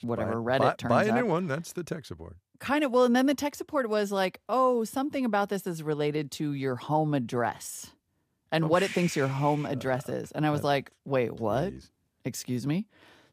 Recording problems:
none

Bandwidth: 15 kHz